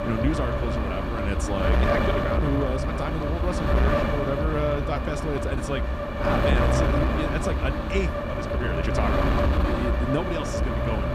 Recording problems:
wind noise on the microphone; heavy; 4 dB above the speech
uneven, jittery; slightly; from 2 to 9 s

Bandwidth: 14.5 kHz